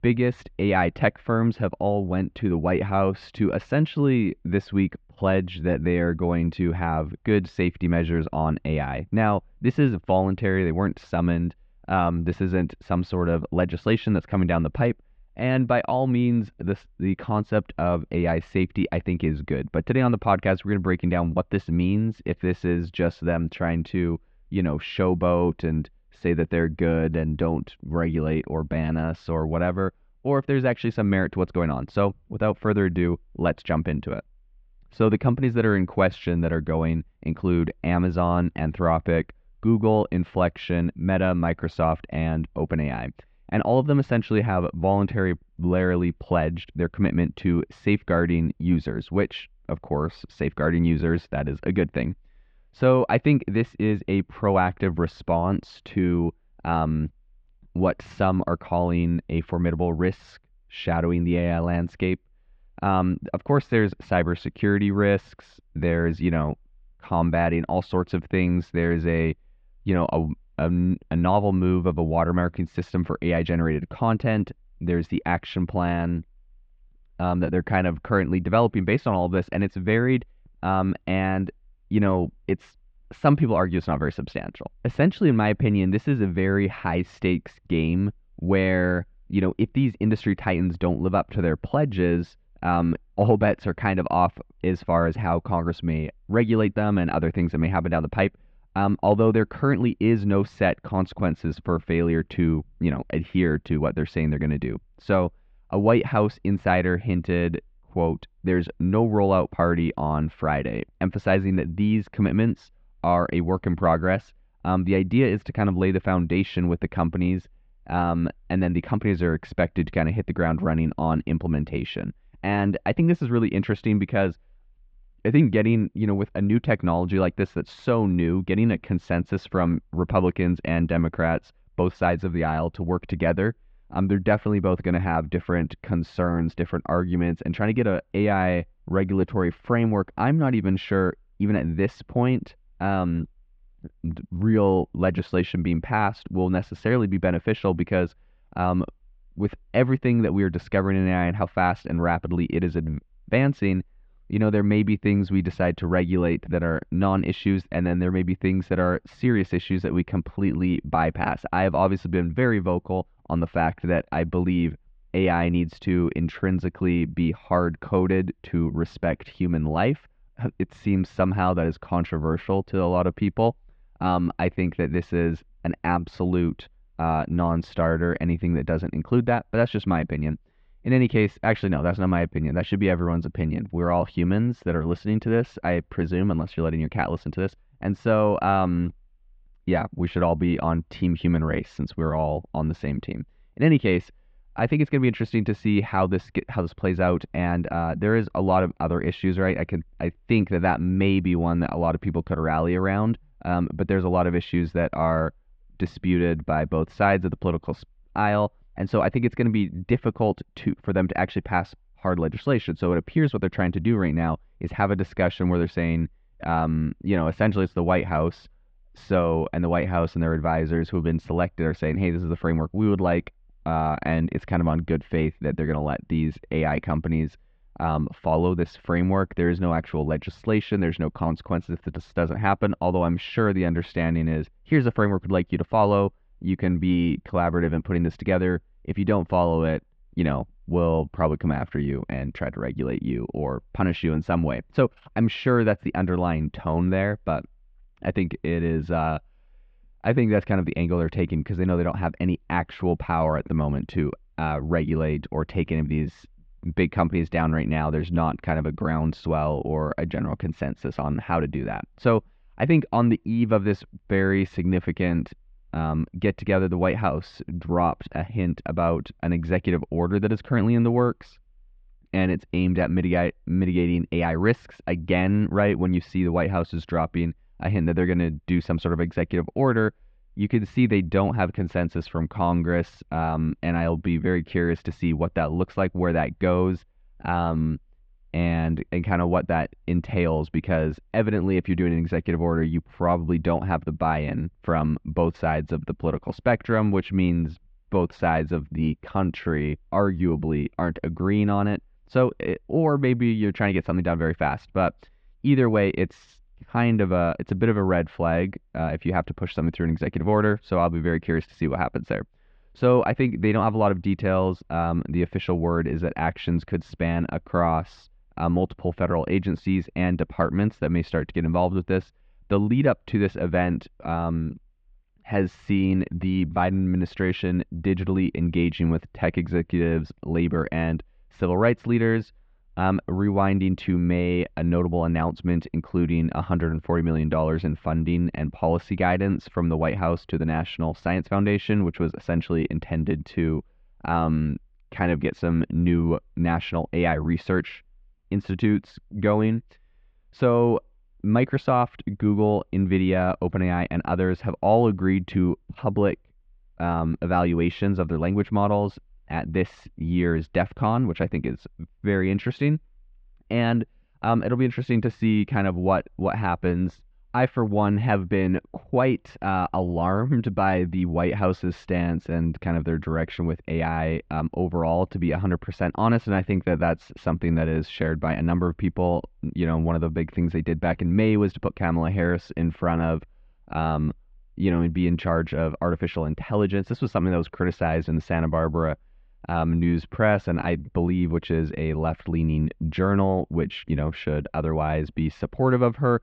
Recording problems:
muffled; very; fading above 3 kHz

